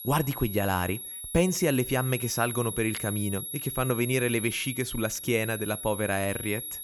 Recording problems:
high-pitched whine; loud; throughout; 11.5 kHz, 6 dB below the speech

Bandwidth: 18.5 kHz